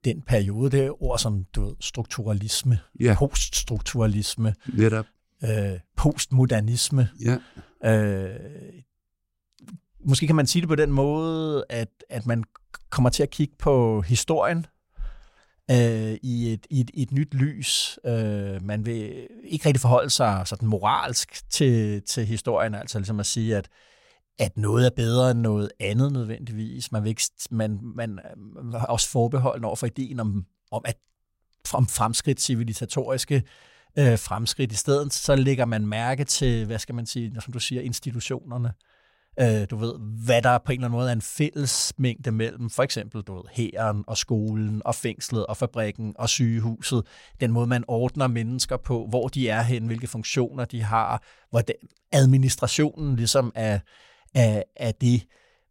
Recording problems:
none

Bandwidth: 16 kHz